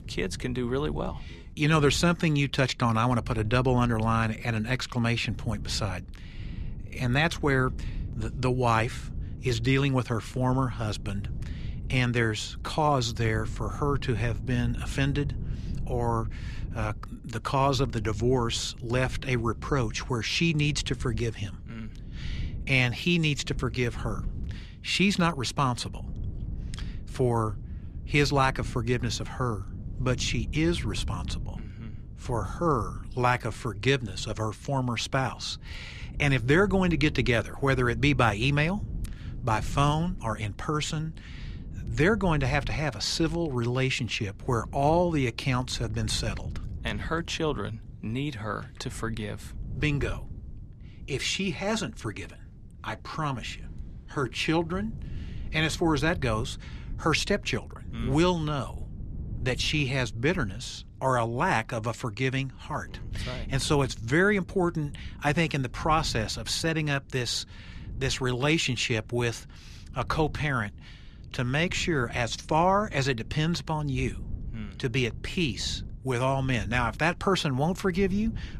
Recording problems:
wind noise on the microphone; occasional gusts; 25 dB below the speech

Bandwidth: 14.5 kHz